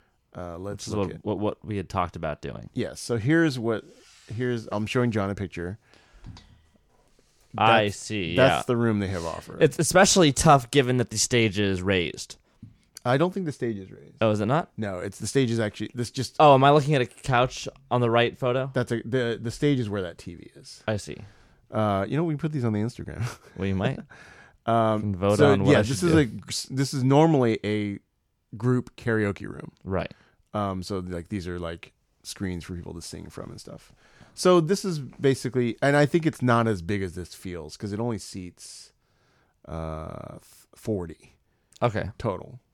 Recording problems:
none

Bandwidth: 18.5 kHz